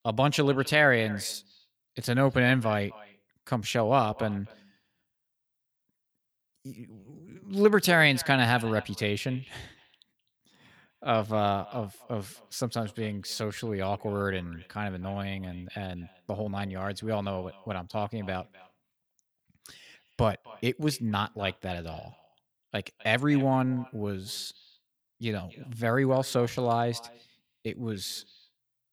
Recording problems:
echo of what is said; faint; throughout; 260 ms later, 20 dB below the speech

